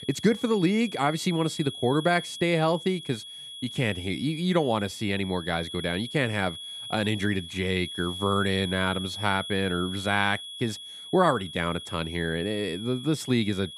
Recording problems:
high-pitched whine; loud; throughout; 3.5 kHz, 10 dB below the speech

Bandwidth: 14.5 kHz